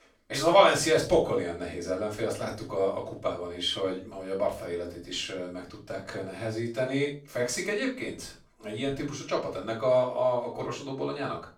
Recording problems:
off-mic speech; far
room echo; slight; dies away in 0.3 s

